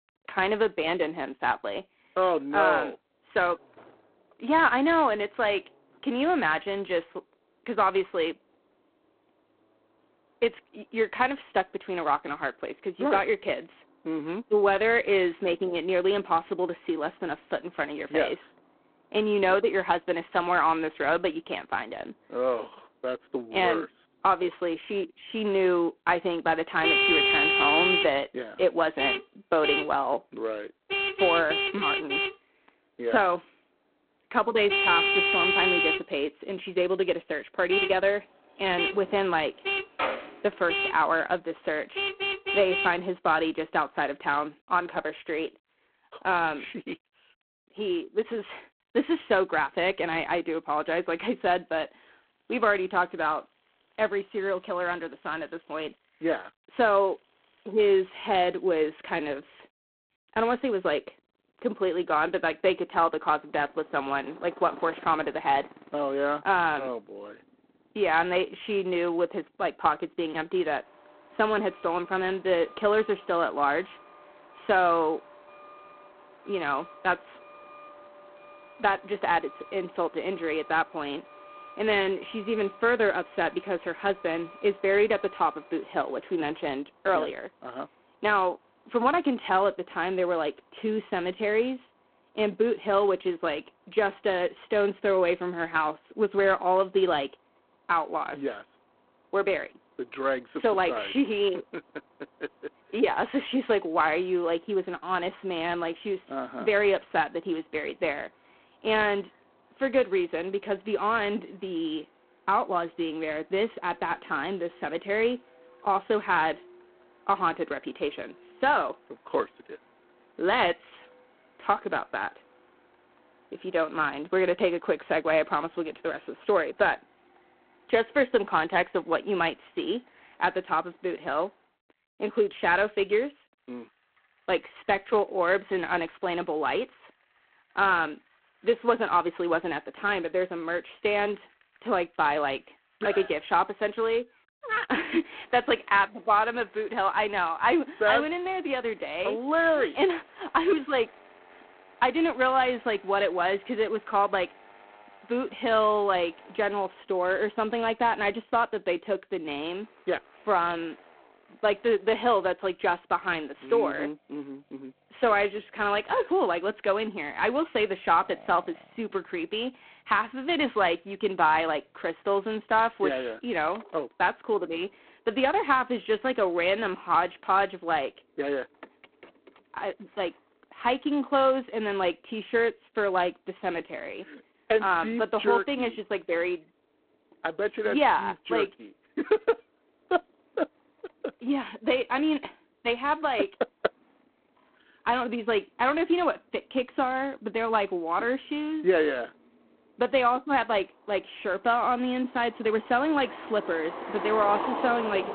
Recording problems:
phone-call audio; poor line; nothing above 3.5 kHz
traffic noise; loud; throughout; as loud as the speech
jangling keys; noticeable; from 39 to 40 s; peak 3 dB below the speech

